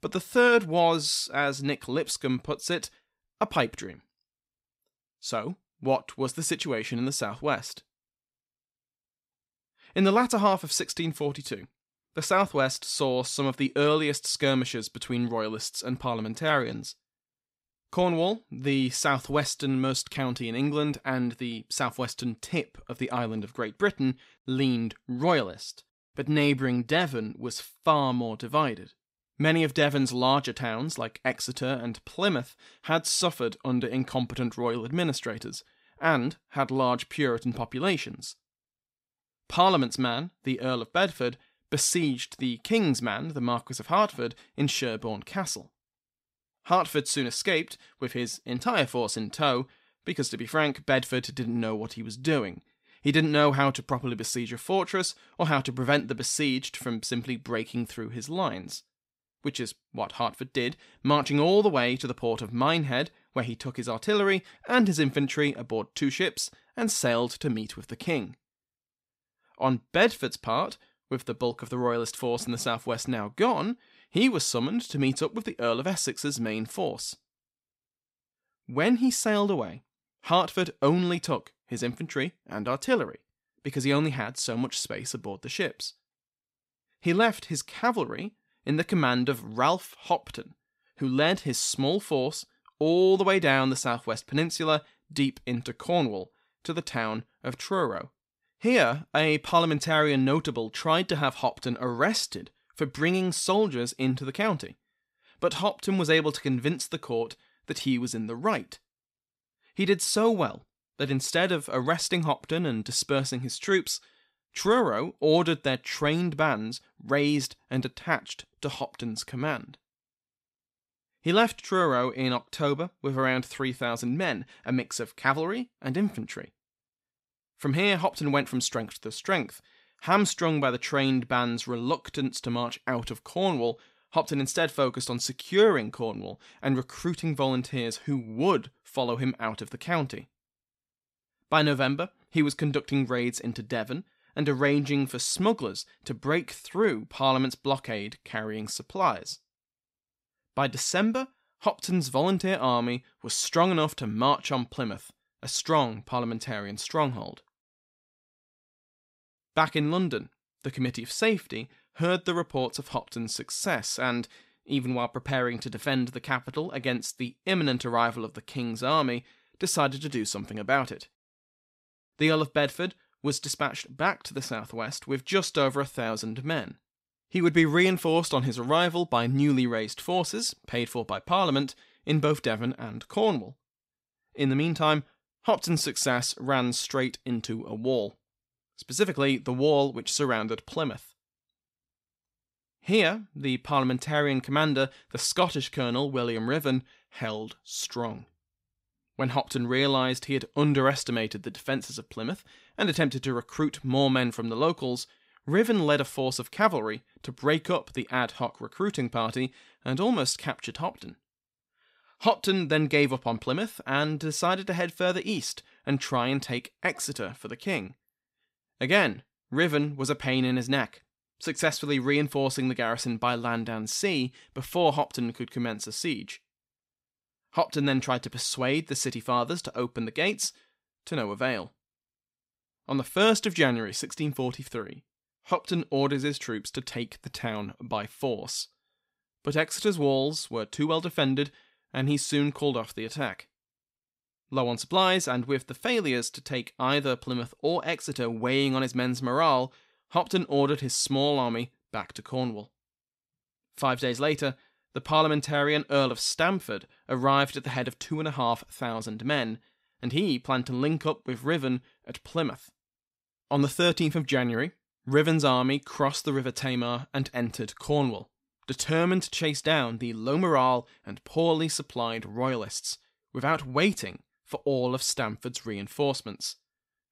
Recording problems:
none

